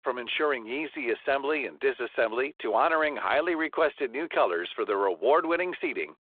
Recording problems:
phone-call audio

